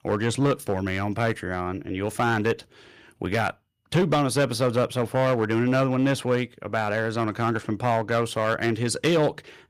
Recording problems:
distortion; slight; 5% of the sound clipped

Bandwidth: 15 kHz